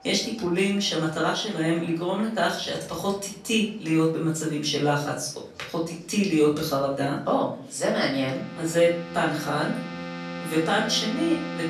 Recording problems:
off-mic speech; far
room echo; slight; dies away in 0.5 s
background music; noticeable; throughout; 10 dB below the speech
chatter from many people; faint; throughout; 25 dB below the speech

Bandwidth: 13.5 kHz